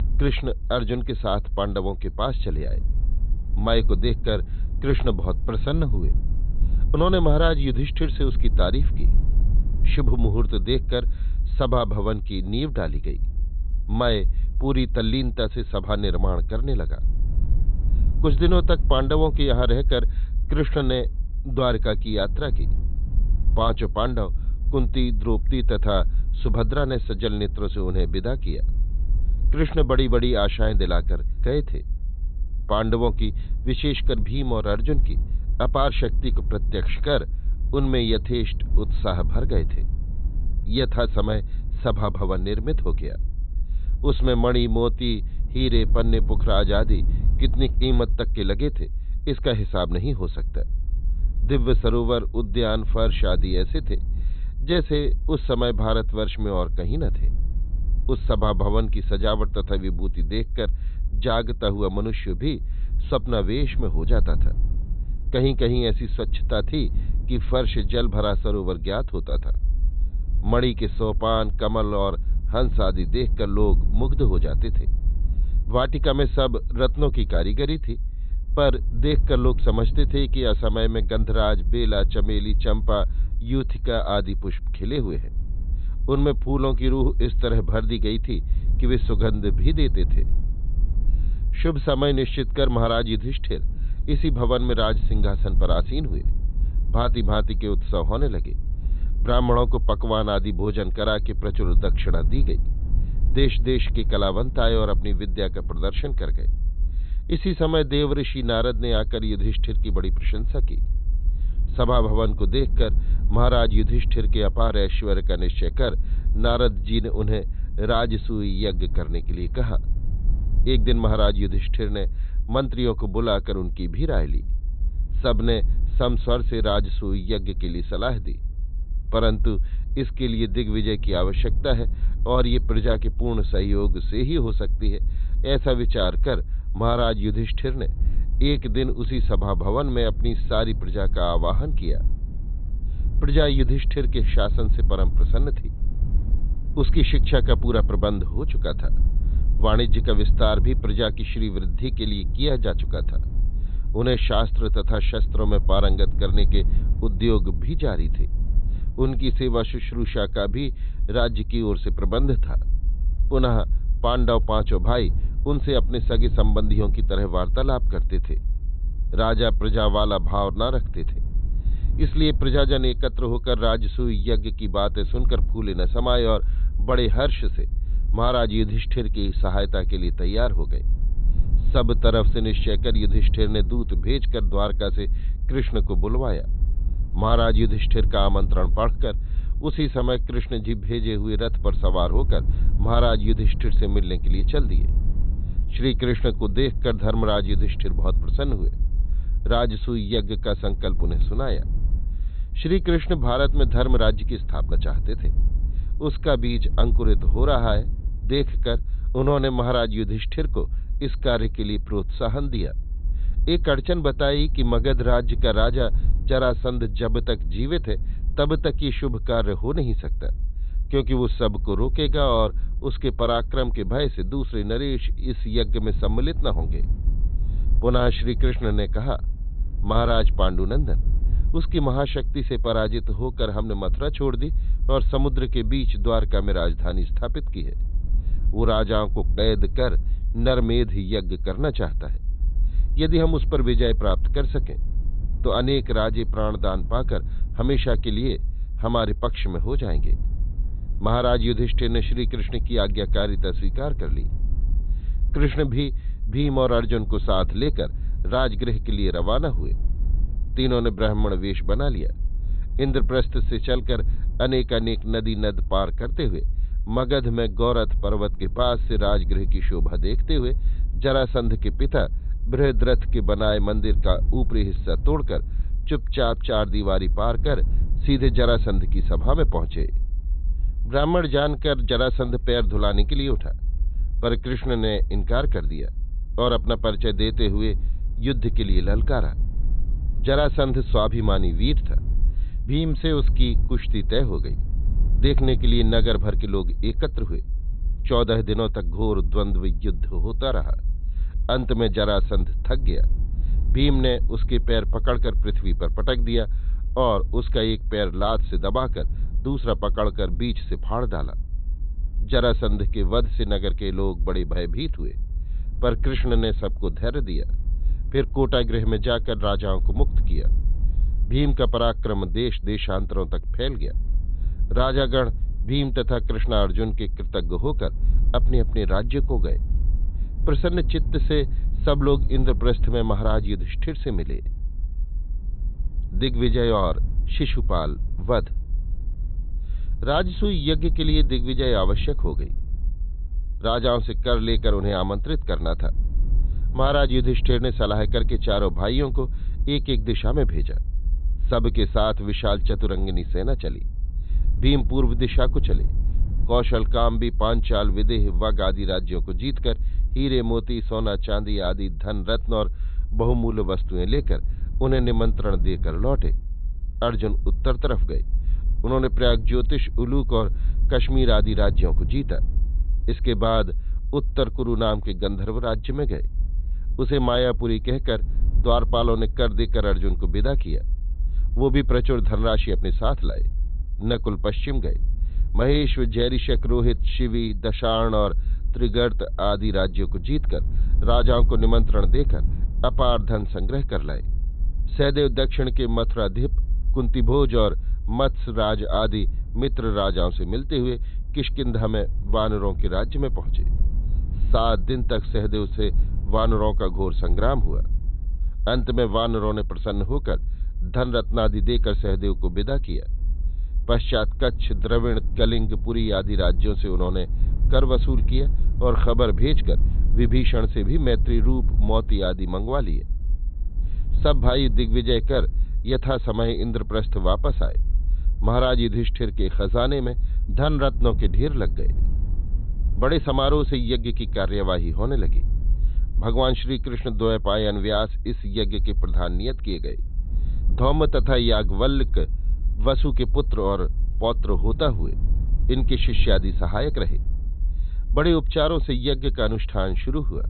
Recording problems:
high frequencies cut off; severe; nothing above 4 kHz
low rumble; faint; throughout; 20 dB below the speech

